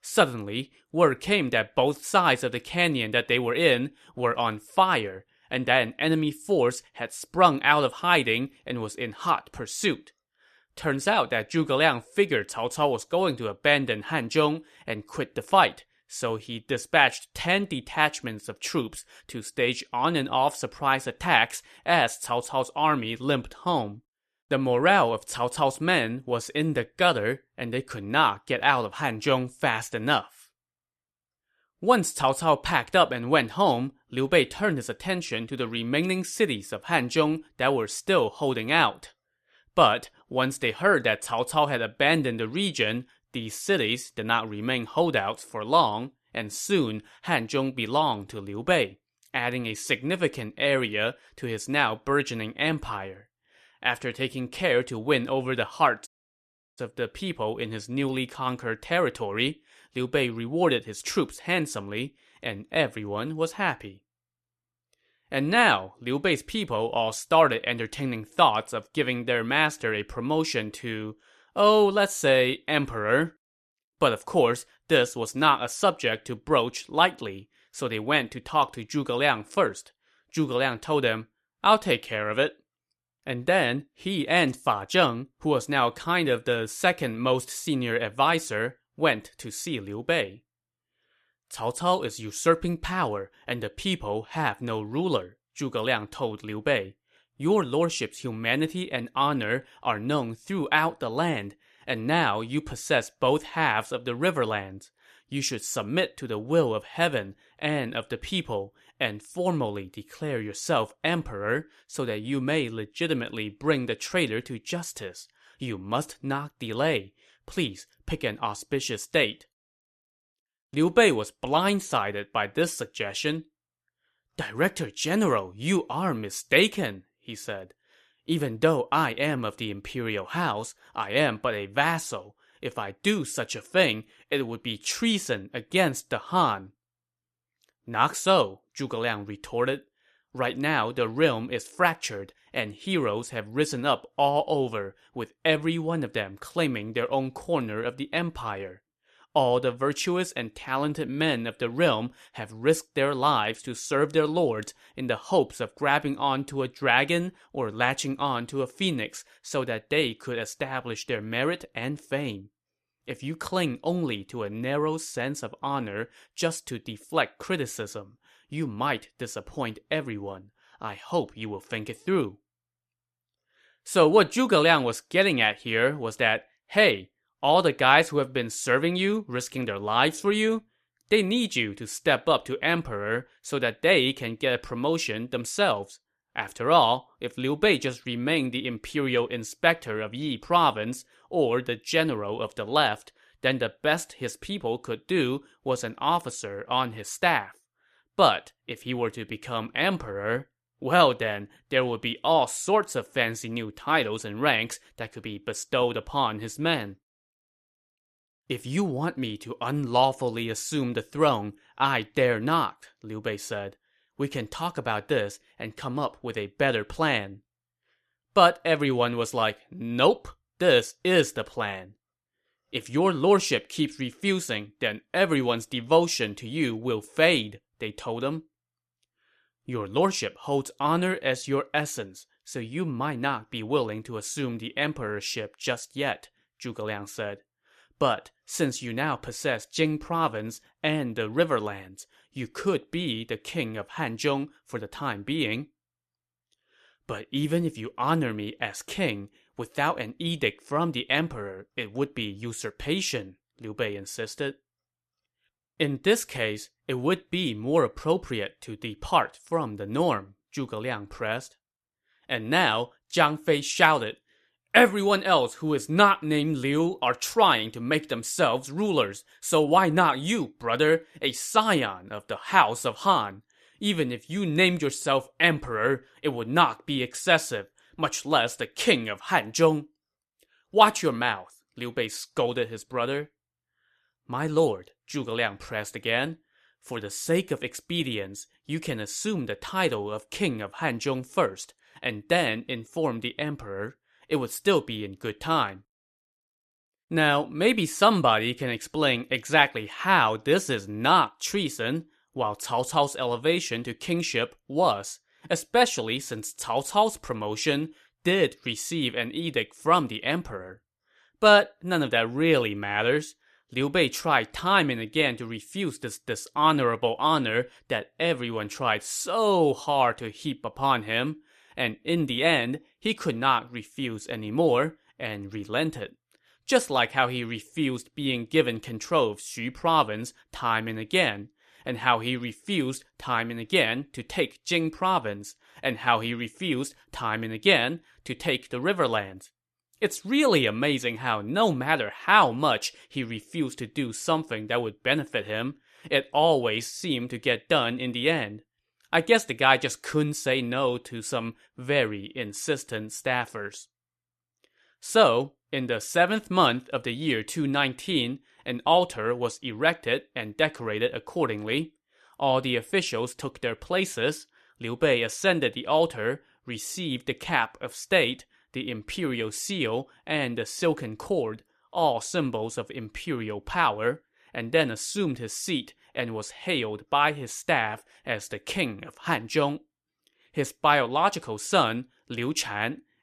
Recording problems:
audio cutting out; at 56 s for 0.5 s

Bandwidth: 14 kHz